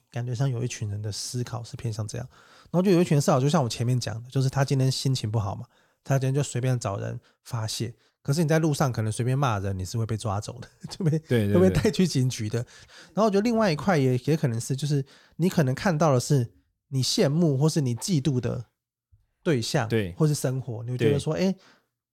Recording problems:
none

